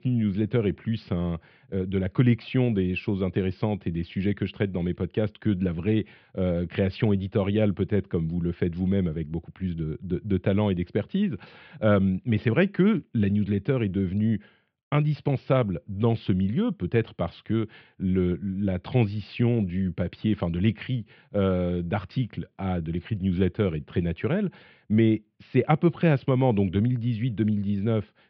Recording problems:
muffled; very; fading above 3 kHz
high frequencies cut off; noticeable; nothing above 5.5 kHz

